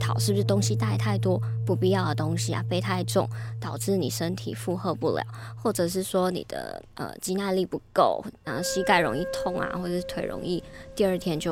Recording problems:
background music; loud; throughout; 4 dB below the speech
abrupt cut into speech; at the start and the end

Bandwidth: 16 kHz